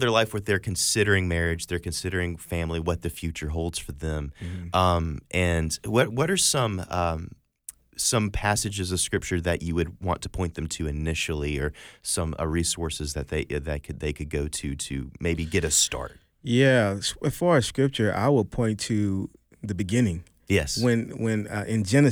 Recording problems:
abrupt cut into speech; at the start and the end

